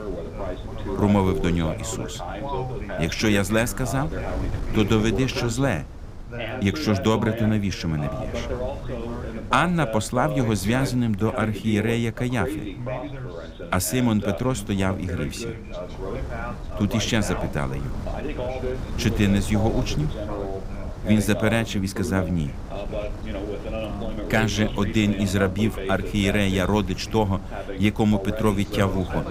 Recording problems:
background chatter; loud; throughout; 2 voices, 9 dB below the speech
wind noise on the microphone; occasional gusts; 20 dB below the speech

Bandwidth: 15.5 kHz